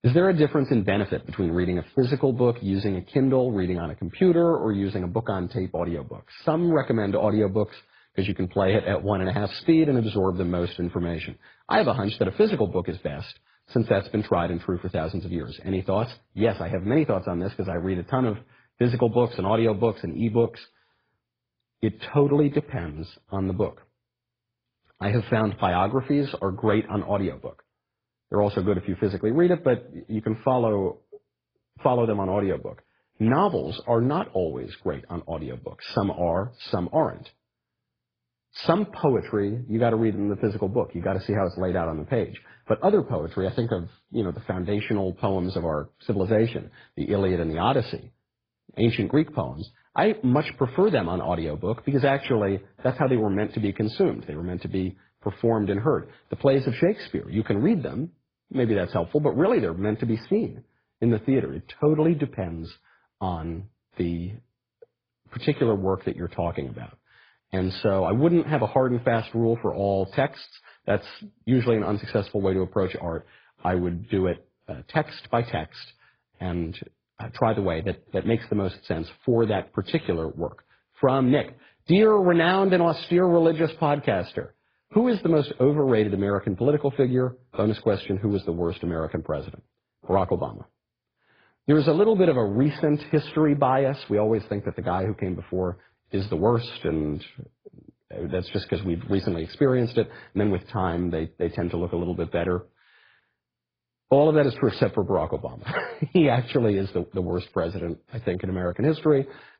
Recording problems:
garbled, watery; badly

